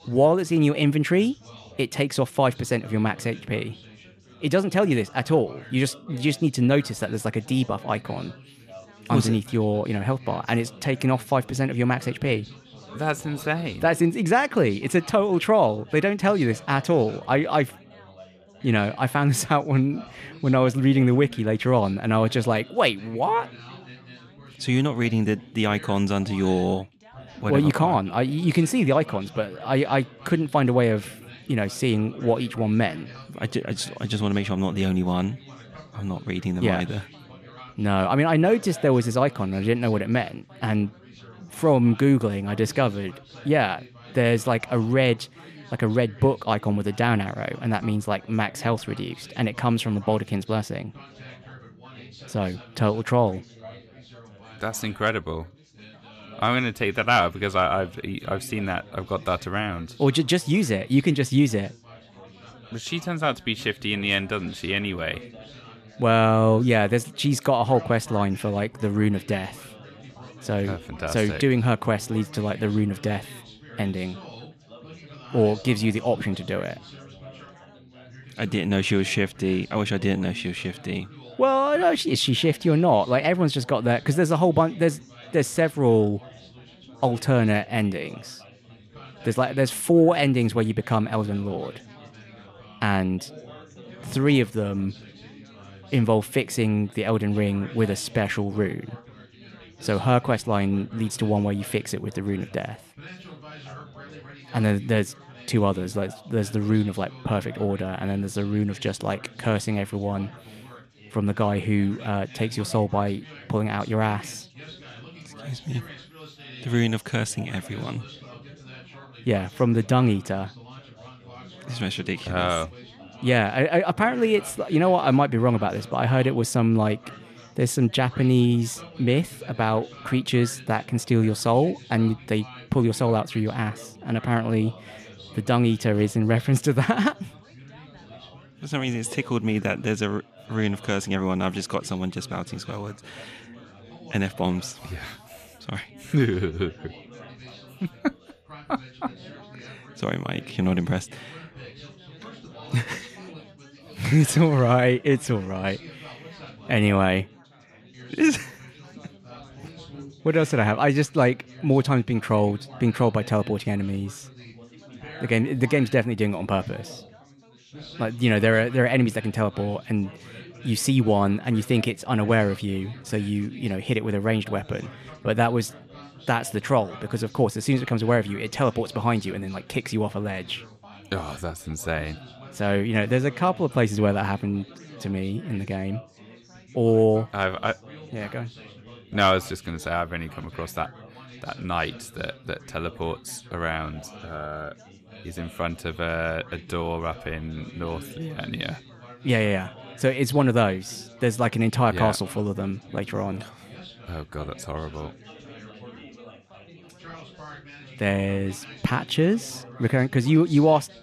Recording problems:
background chatter; faint; throughout; 4 voices, 20 dB below the speech

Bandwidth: 14.5 kHz